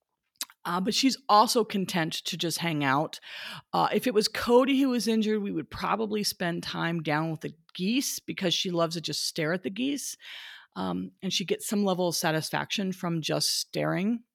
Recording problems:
none

